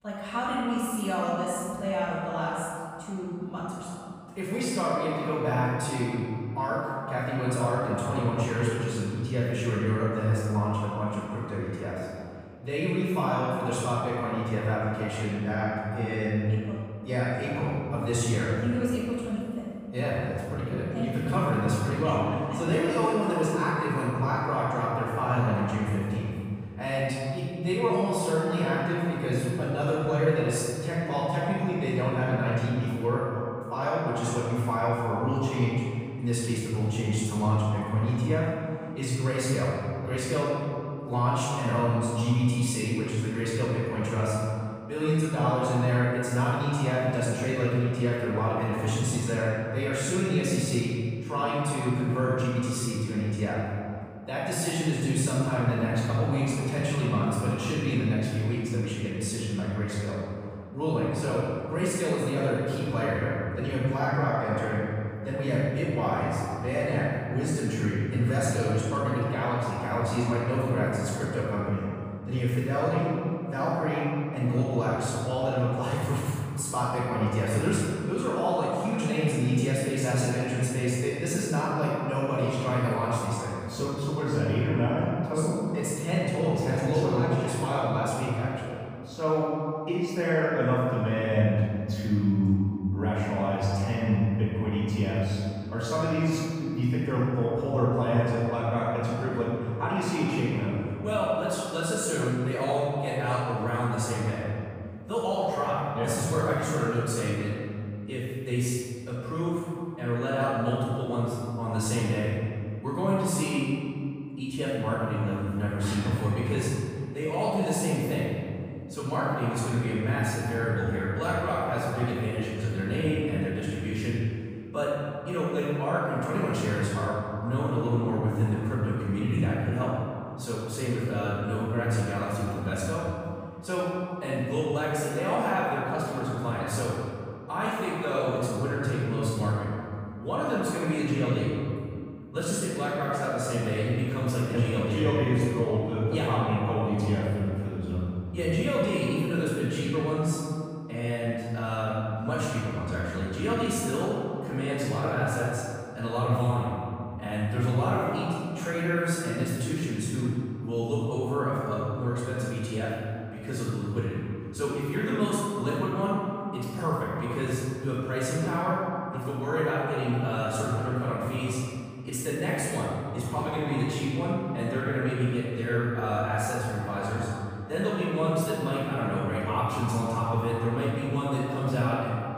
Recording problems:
room echo; strong; dies away in 2.3 s
off-mic speech; far

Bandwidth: 15 kHz